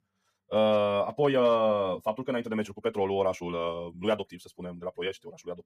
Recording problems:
wrong speed, natural pitch; too fast; 1.6 times normal speed

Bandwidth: 15 kHz